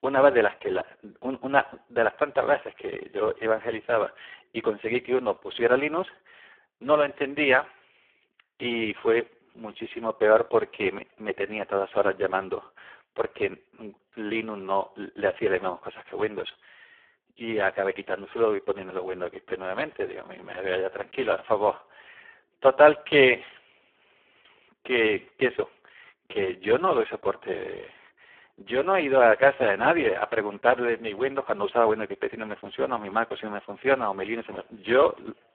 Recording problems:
phone-call audio; poor line

